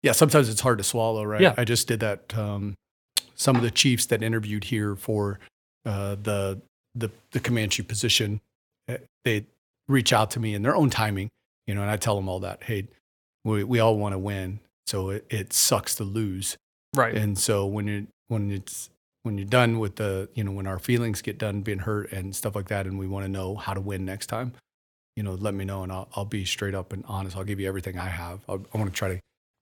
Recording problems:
none

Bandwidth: 18 kHz